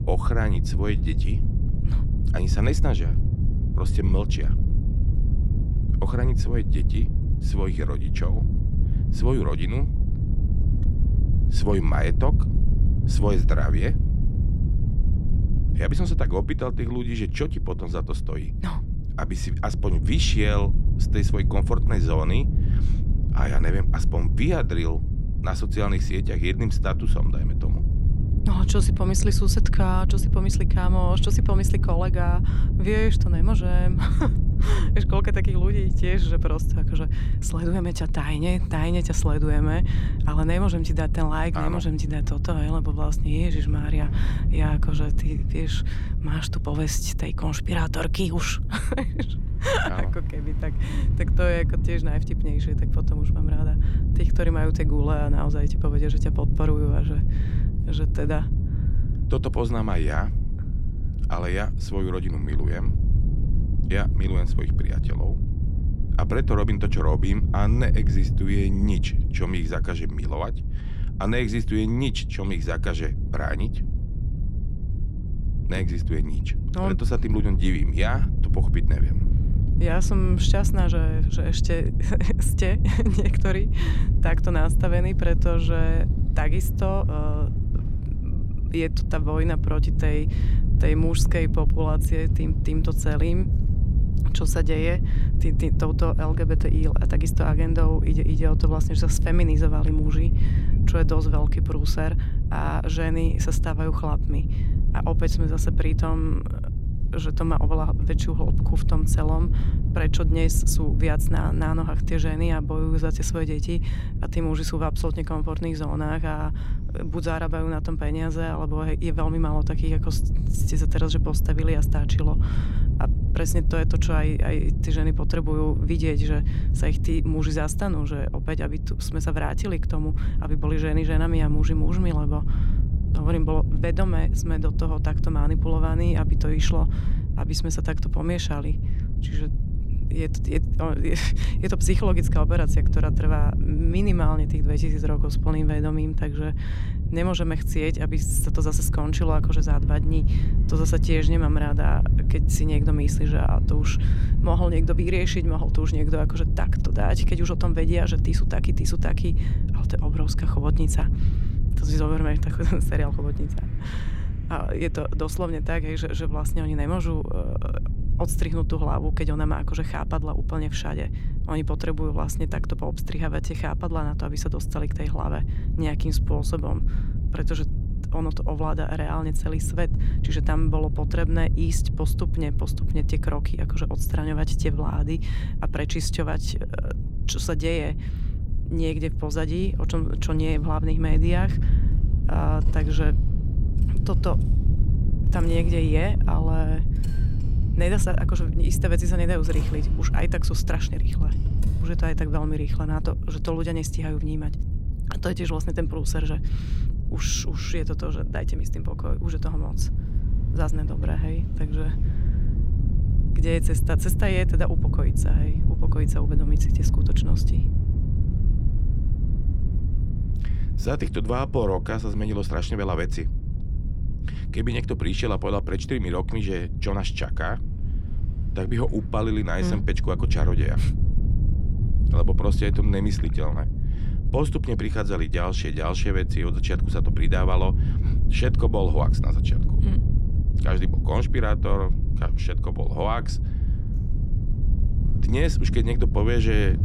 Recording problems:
wind noise on the microphone; heavy; 8 dB below the speech
traffic noise; faint; throughout; 25 dB below the speech

